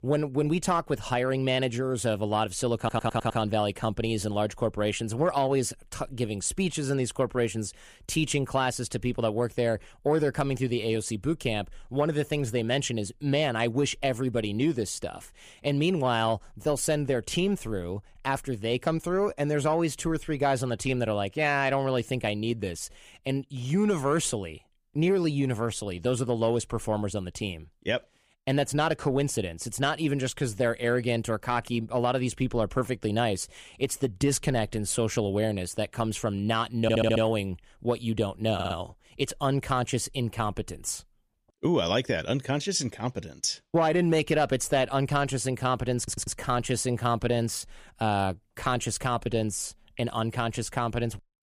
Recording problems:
audio stuttering; 4 times, first at 3 s

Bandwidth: 15 kHz